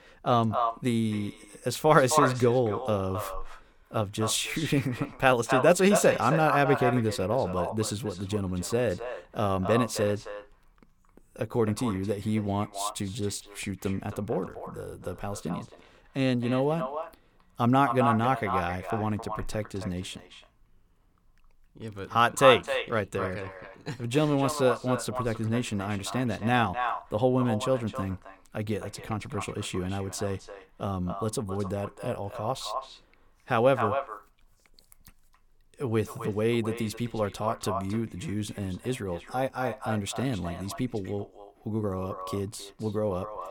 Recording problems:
echo of what is said; strong; throughout; 270 ms later, 6 dB below the speech

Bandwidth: 18 kHz